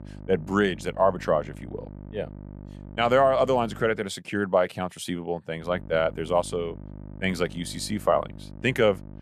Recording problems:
electrical hum; faint; until 4 s and from 5.5 s on; 50 Hz, 25 dB below the speech

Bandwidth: 14.5 kHz